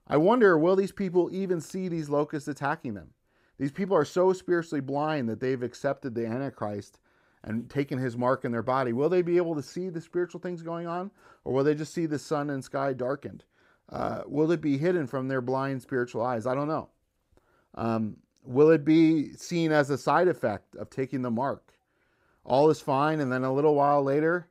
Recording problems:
none

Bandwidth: 15.5 kHz